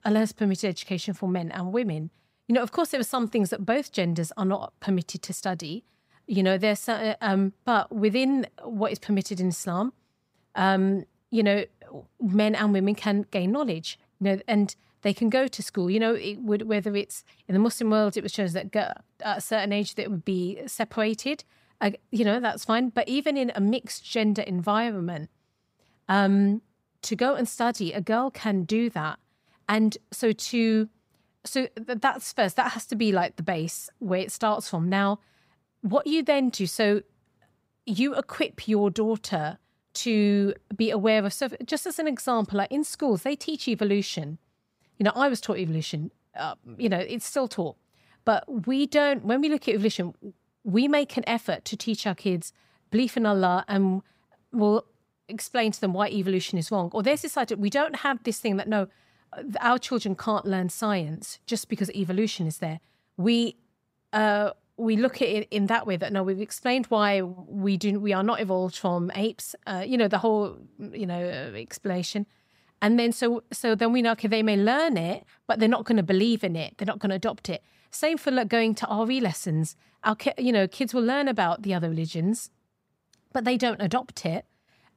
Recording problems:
none

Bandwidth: 15.5 kHz